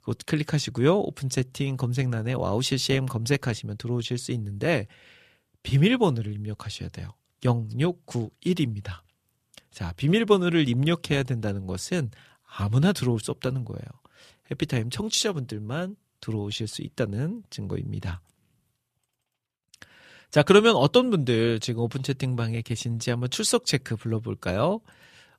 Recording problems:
none

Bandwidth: 14.5 kHz